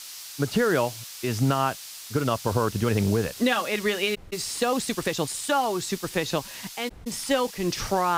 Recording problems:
hiss; noticeable; throughout; 10 dB below the speech
uneven, jittery; strongly; from 2 to 7.5 s
audio cutting out; at 4 s and at 7 s
abrupt cut into speech; at the end

